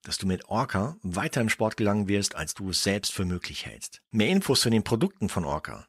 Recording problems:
none

